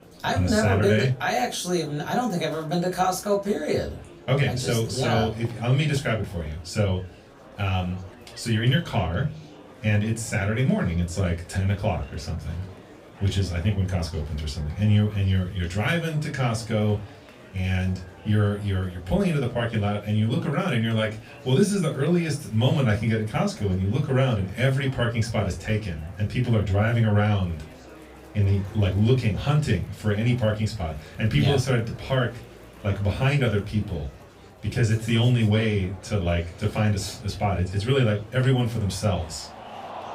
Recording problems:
off-mic speech; far
room echo; very slight; dies away in 0.2 s
murmuring crowd; faint; throughout; 20 dB below the speech

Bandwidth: 15.5 kHz